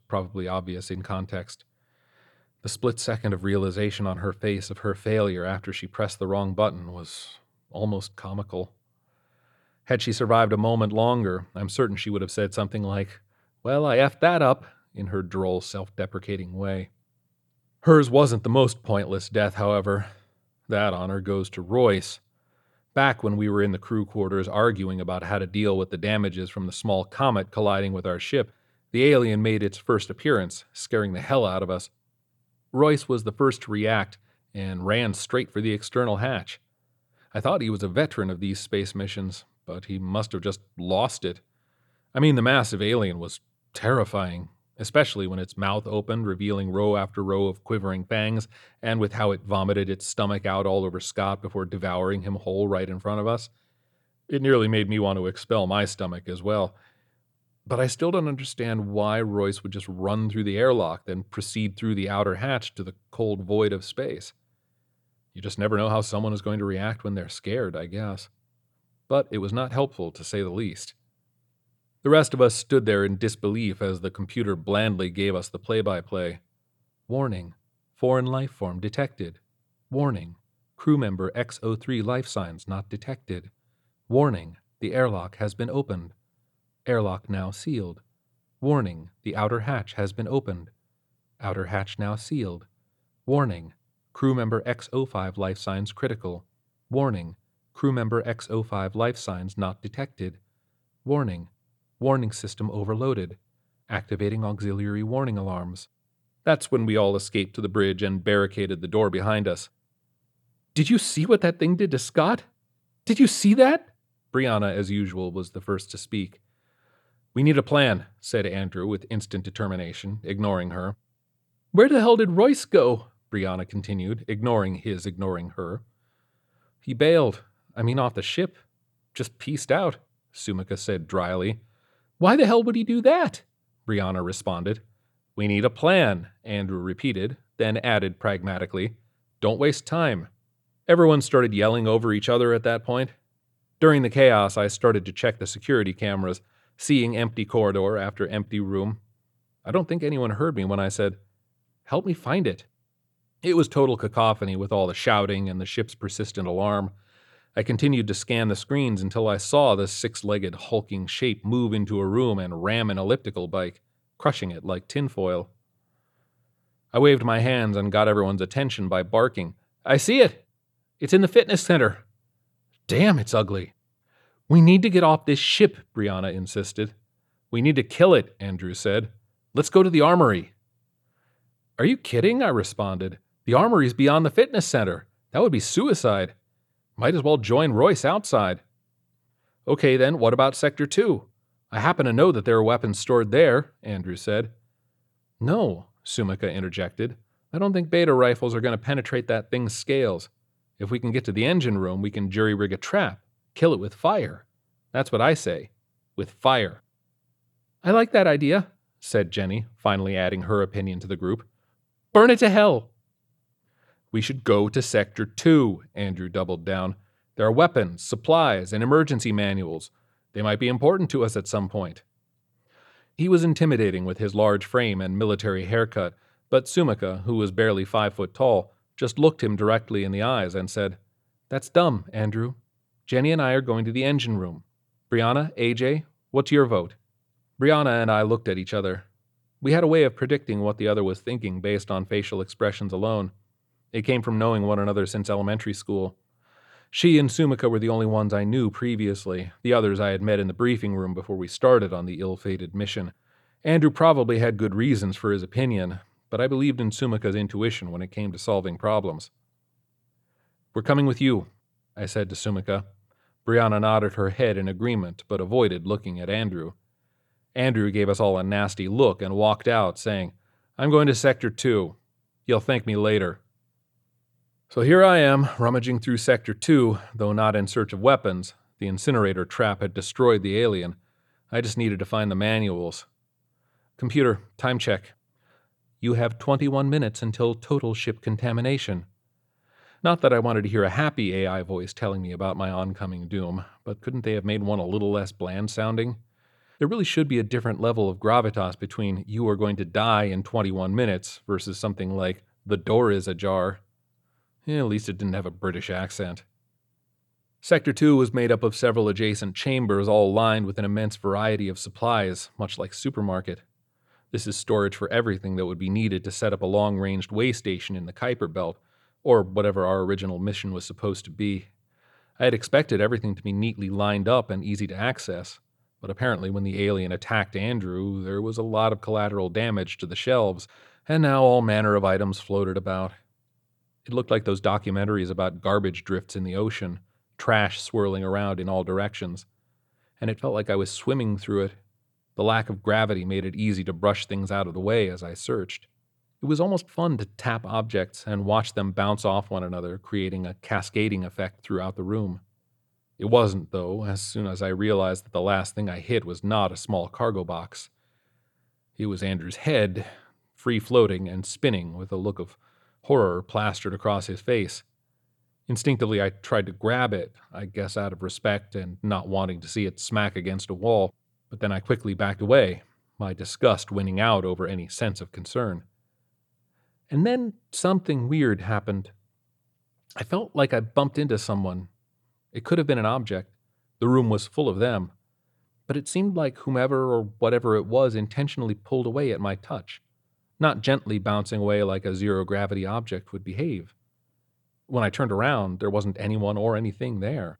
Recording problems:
none

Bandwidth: 18.5 kHz